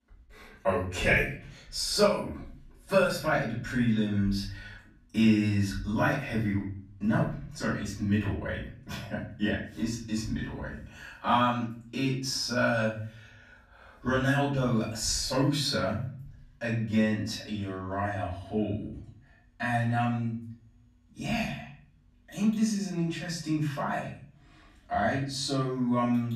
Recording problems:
off-mic speech; far
room echo; noticeable; dies away in 0.5 s

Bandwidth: 14.5 kHz